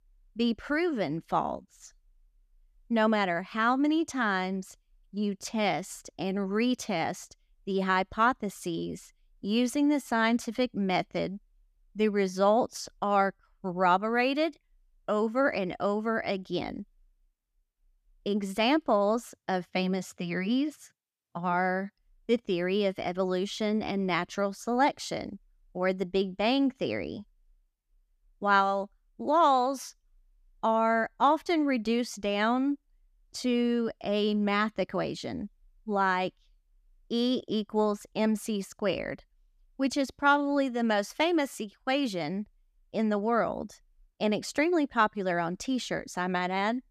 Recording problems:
none

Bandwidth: 14.5 kHz